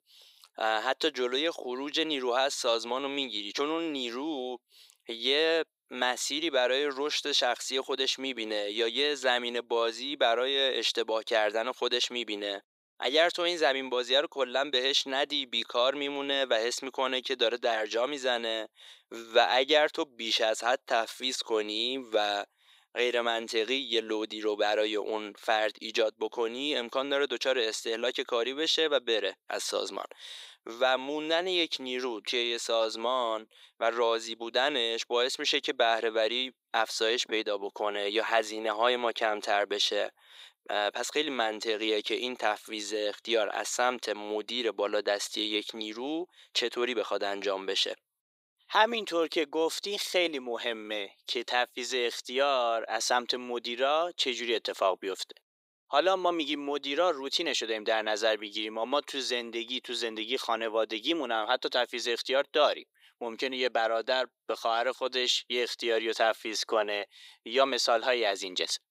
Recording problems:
thin; very; fading below 400 Hz

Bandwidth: 15.5 kHz